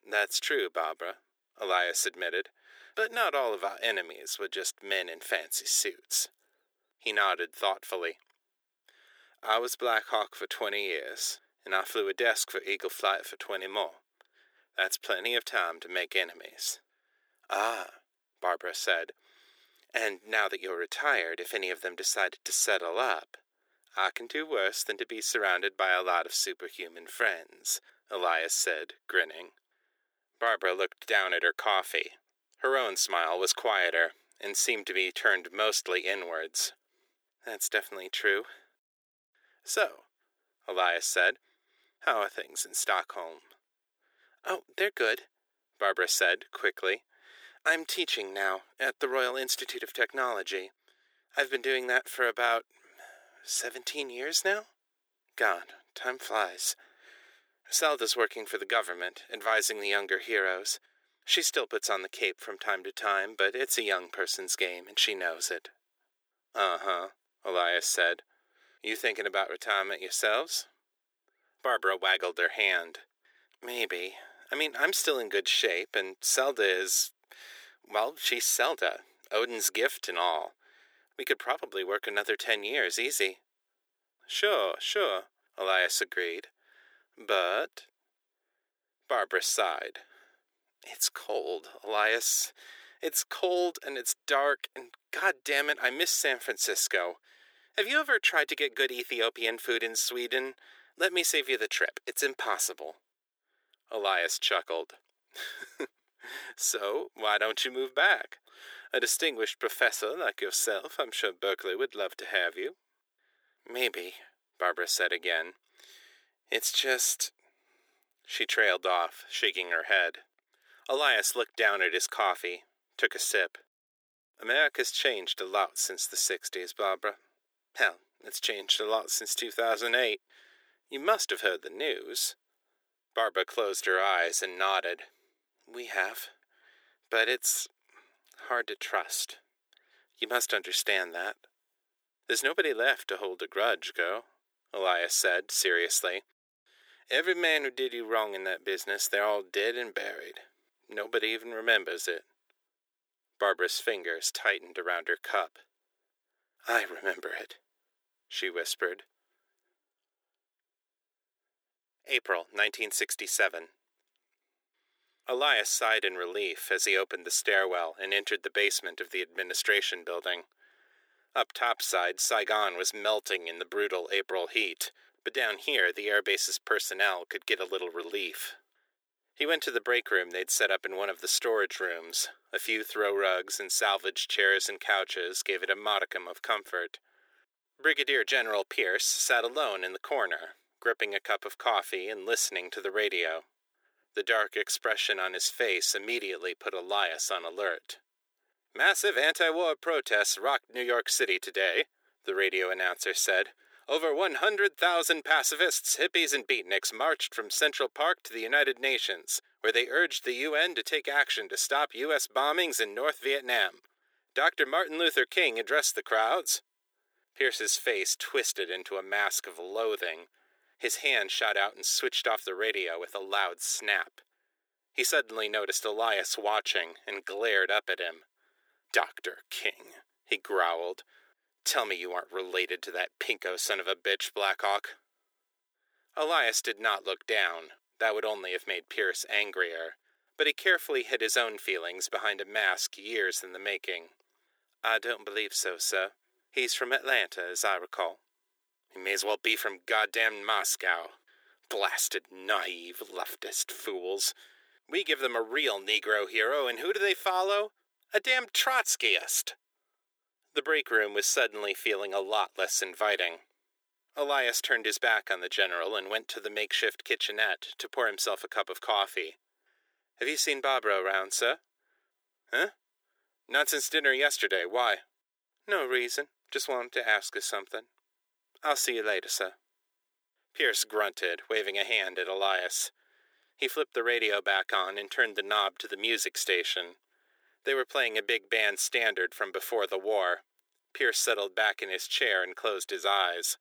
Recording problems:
thin; very; fading below 350 Hz

